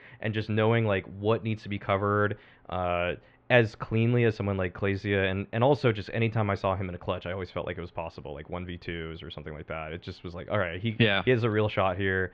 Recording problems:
muffled; very; fading above 3 kHz

